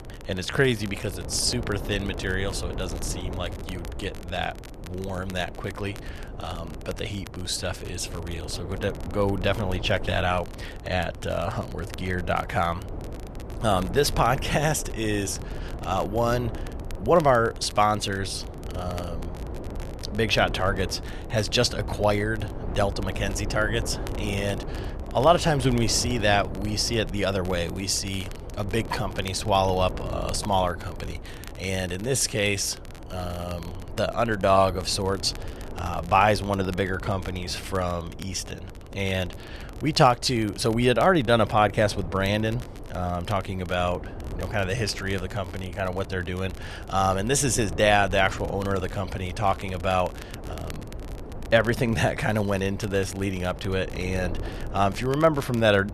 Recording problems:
wind noise on the microphone; occasional gusts; 15 dB below the speech
crackle, like an old record; faint; 25 dB below the speech

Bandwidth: 13.5 kHz